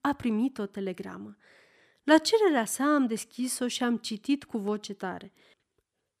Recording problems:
none

